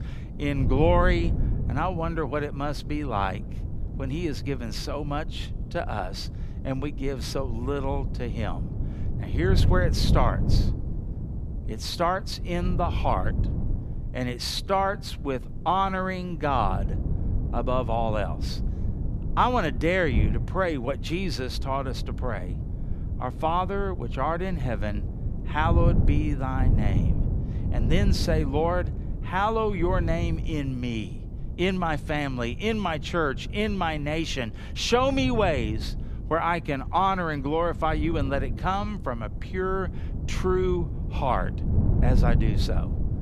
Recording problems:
wind noise on the microphone; occasional gusts; 15 dB below the speech

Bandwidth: 14.5 kHz